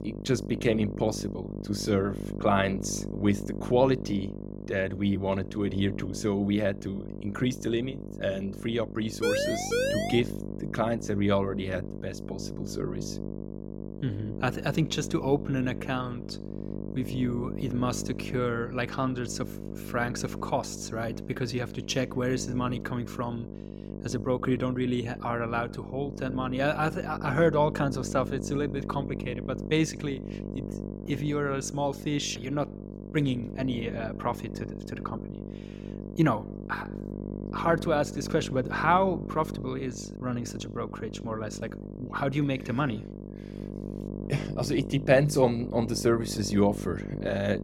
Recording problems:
electrical hum; noticeable; throughout; 50 Hz, 10 dB below the speech
siren; loud; at 9 s; peak 2 dB above the speech

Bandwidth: 16.5 kHz